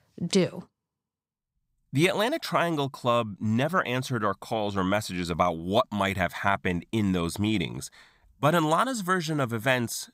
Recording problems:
none

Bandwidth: 15.5 kHz